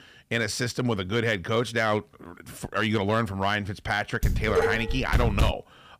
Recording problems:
distortion; slight; 3% of the sound clipped
clattering dishes; loud; from 4 s on; peak 1 dB above the speech

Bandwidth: 15 kHz